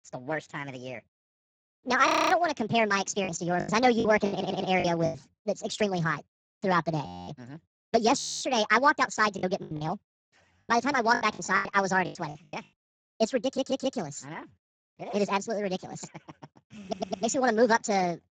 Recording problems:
garbled, watery; badly
wrong speed and pitch; too fast and too high; 1.5 times normal speed
audio freezing; at 2 s, at 7 s and at 8 s
choppy; very; from 3.5 to 5 s and from 9.5 to 12 s; 19% of the speech affected
audio stuttering; at 4.5 s, at 13 s and at 17 s

